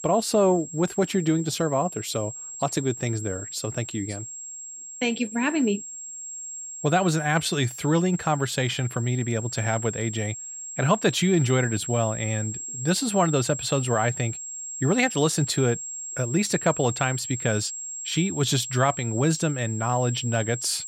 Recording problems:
high-pitched whine; loud; throughout; 7.5 kHz, 8 dB below the speech

